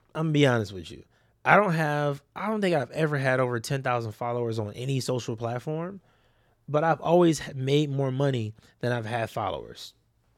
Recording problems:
none

